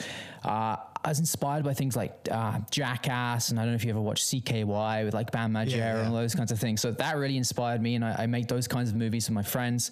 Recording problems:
squashed, flat; heavily

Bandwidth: 14.5 kHz